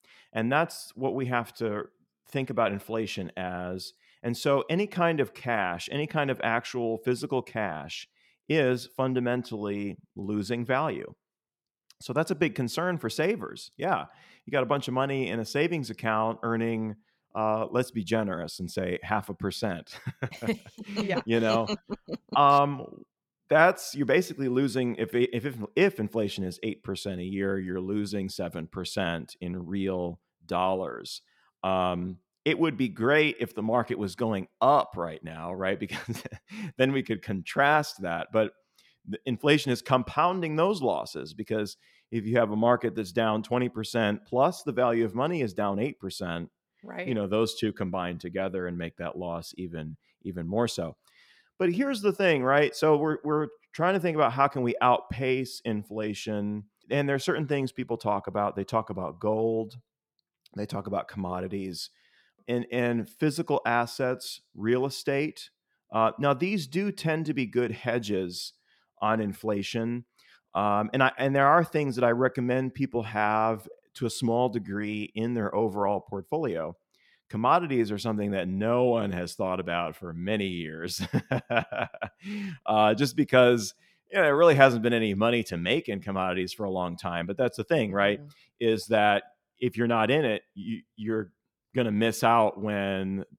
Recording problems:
none

